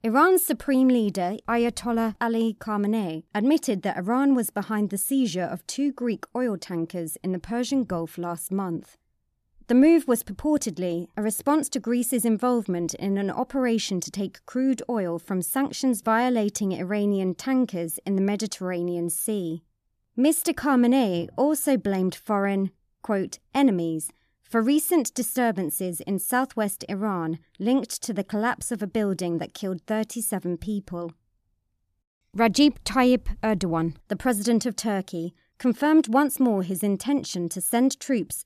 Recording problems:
none

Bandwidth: 14.5 kHz